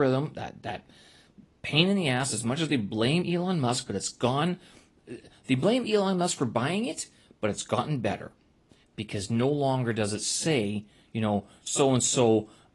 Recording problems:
garbled, watery; slightly
abrupt cut into speech; at the start

